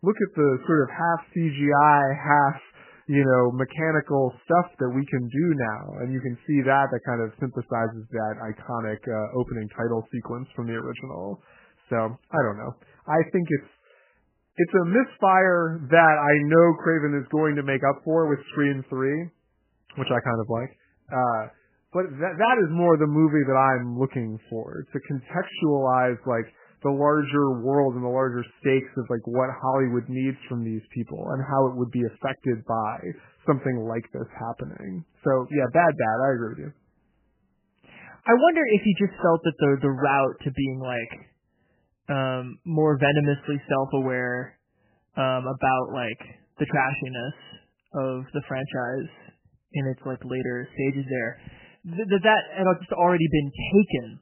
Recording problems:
garbled, watery; badly; nothing above 3 kHz

